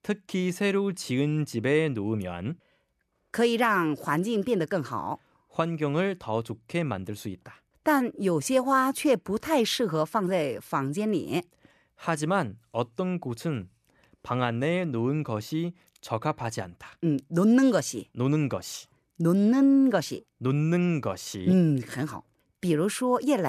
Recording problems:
abrupt cut into speech; at the end

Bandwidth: 14 kHz